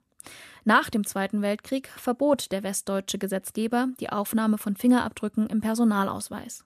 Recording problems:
none

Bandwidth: 14.5 kHz